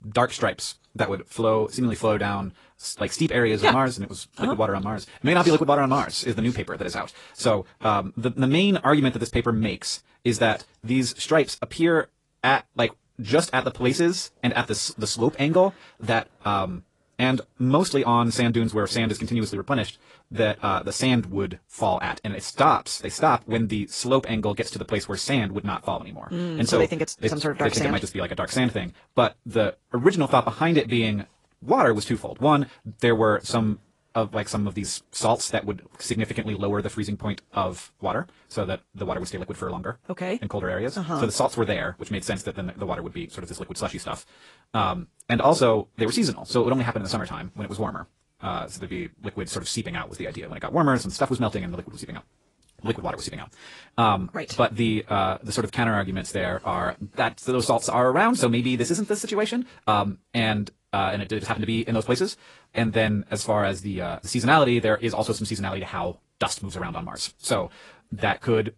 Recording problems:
wrong speed, natural pitch; too fast; 1.5 times normal speed
garbled, watery; slightly; nothing above 10.5 kHz

